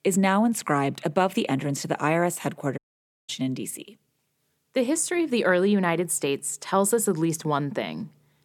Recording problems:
audio cutting out; at 3 s for 0.5 s

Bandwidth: 17.5 kHz